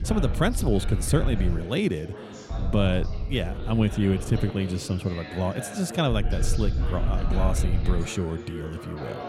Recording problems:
background chatter; noticeable; throughout; 2 voices, 10 dB below the speech
wind noise on the microphone; occasional gusts; until 1.5 s, from 2.5 to 4.5 s and from 6 to 8 s; 15 dB below the speech

